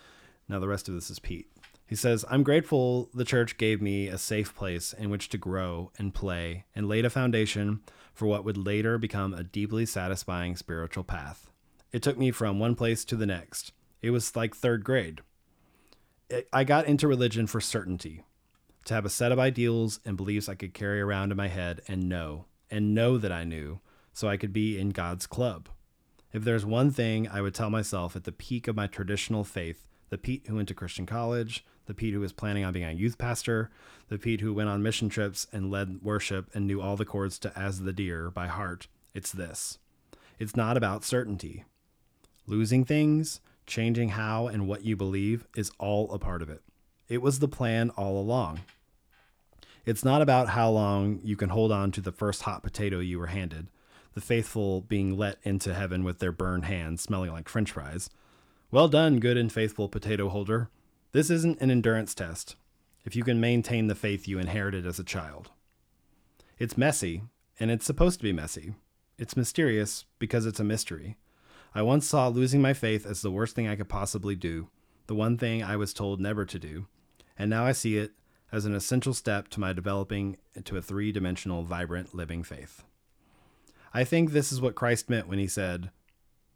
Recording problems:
none

